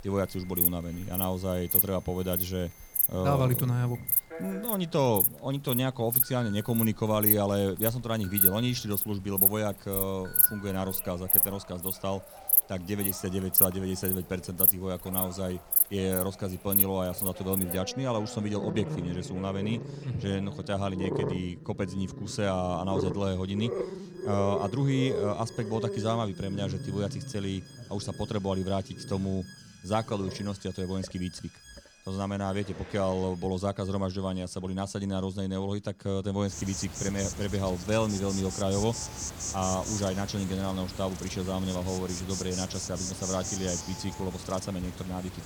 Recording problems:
animal sounds; very loud; throughout; 2 dB above the speech
alarms or sirens; noticeable; throughout; 20 dB below the speech

